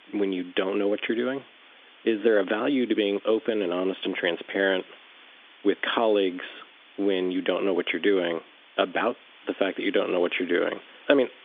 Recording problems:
phone-call audio; nothing above 3.5 kHz
hiss; faint; throughout; 25 dB below the speech

